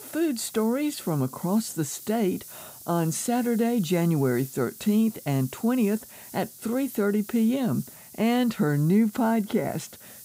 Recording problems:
hiss; noticeable; throughout; 15 dB below the speech

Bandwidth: 15.5 kHz